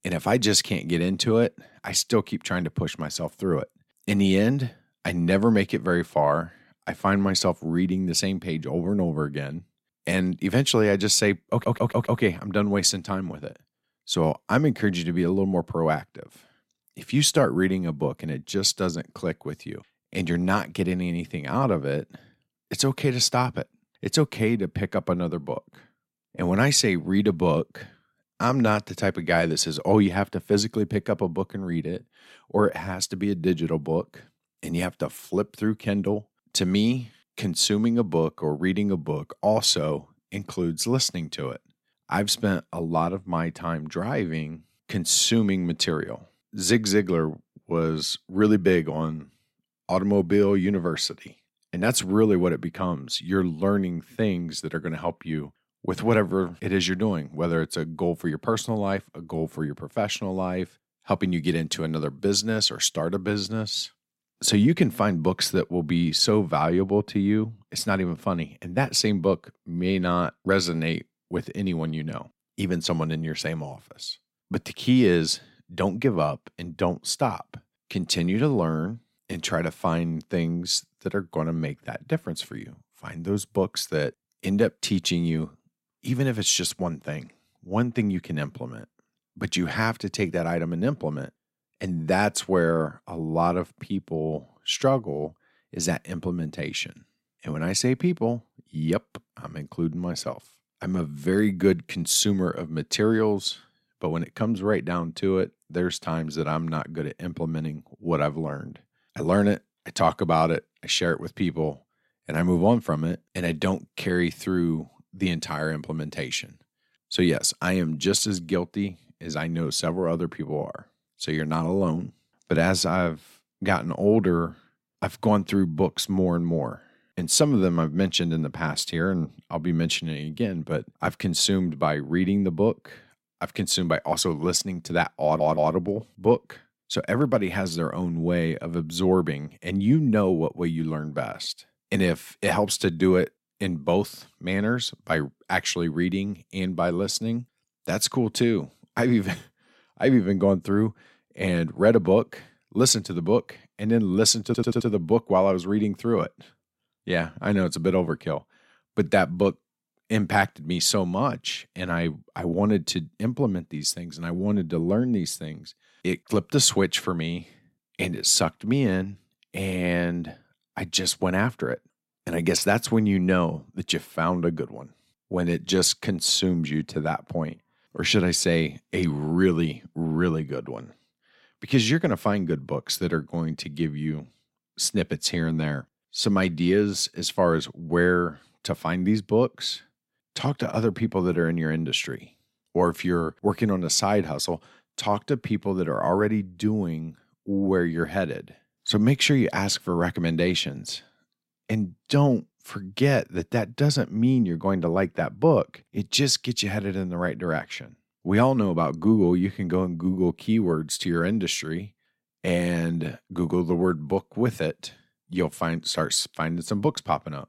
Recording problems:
audio stuttering; at 12 s, at 2:15 and at 2:34

